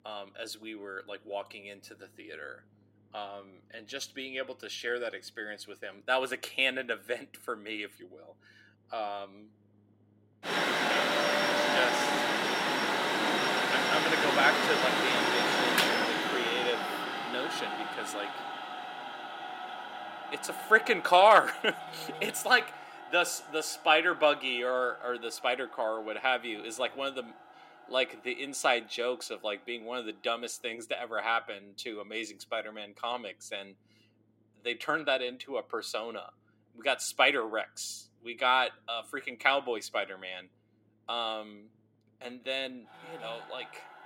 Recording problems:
thin; somewhat; fading below 300 Hz
machinery noise; very loud; throughout; 1 dB above the speech

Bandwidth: 16 kHz